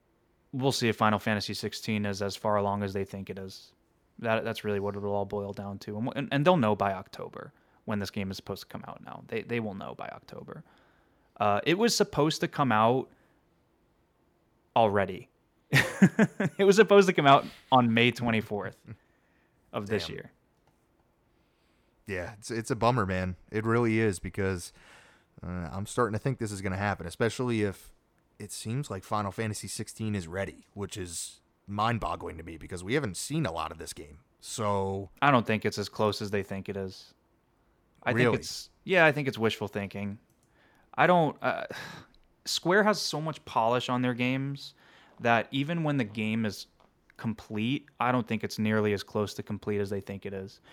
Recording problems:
none

